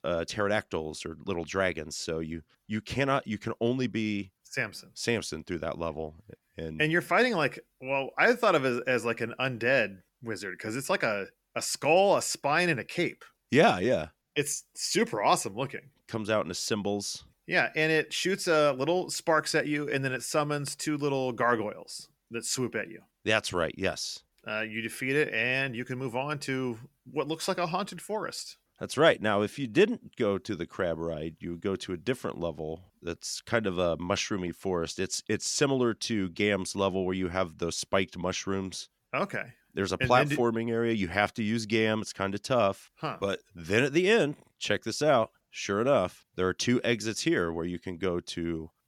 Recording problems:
none

